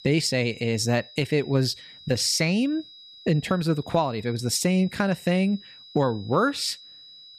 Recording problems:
high-pitched whine; noticeable; throughout; 4 kHz, 20 dB below the speech

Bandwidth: 14.5 kHz